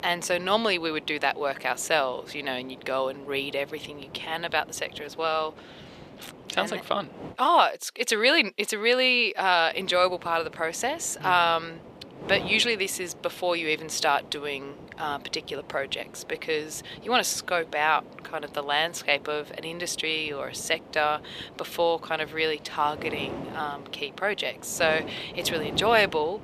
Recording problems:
thin; very; fading below 500 Hz
wind noise on the microphone; occasional gusts; until 7.5 s and from 9.5 s on; 20 dB below the speech

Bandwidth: 14.5 kHz